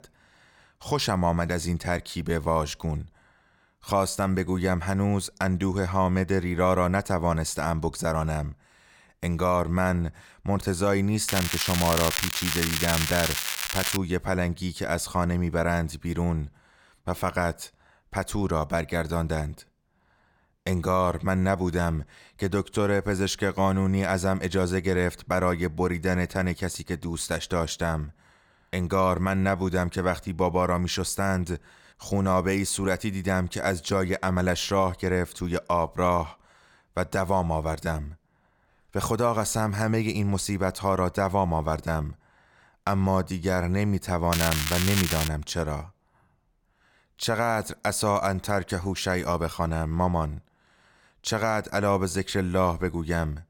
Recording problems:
crackling; loud; from 11 to 14 s and at 44 s; 1 dB below the speech

